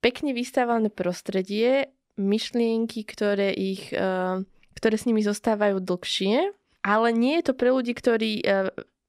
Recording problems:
none

